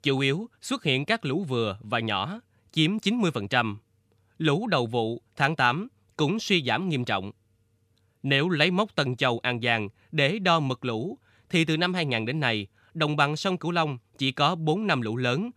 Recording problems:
none

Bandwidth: 15 kHz